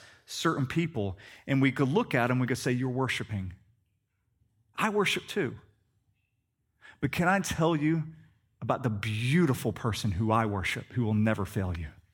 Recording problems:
none

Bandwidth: 18 kHz